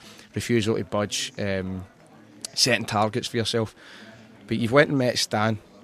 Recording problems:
chatter from many people; faint; throughout; 25 dB below the speech

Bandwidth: 14 kHz